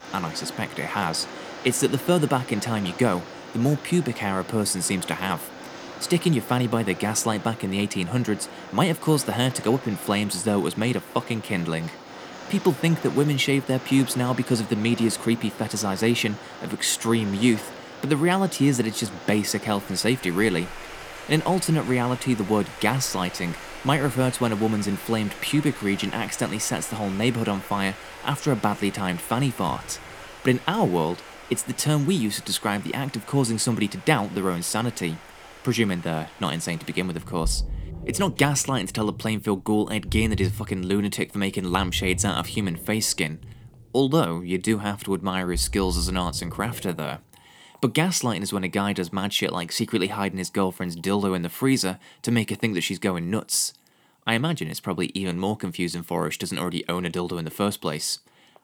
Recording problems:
rain or running water; noticeable; throughout; 15 dB below the speech

